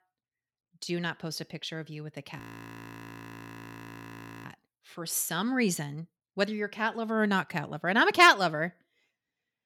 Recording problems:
audio freezing; at 2.5 s for 2 s

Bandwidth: 17.5 kHz